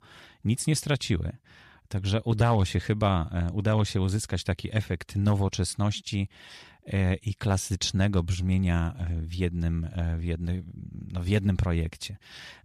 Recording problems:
none

